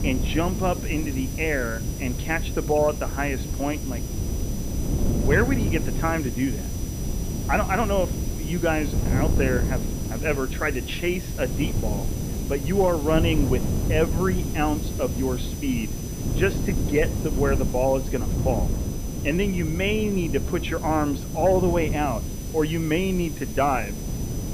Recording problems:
muffled; slightly; fading above 4 kHz
high-pitched whine; noticeable; throughout; 6 kHz, 15 dB below the speech
wind noise on the microphone; occasional gusts; 10 dB below the speech
hiss; noticeable; throughout; 15 dB below the speech
low rumble; faint; until 14 s; 25 dB below the speech

